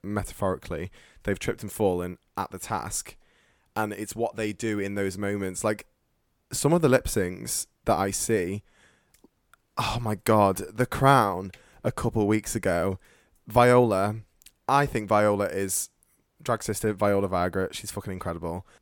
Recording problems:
none

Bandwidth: 17.5 kHz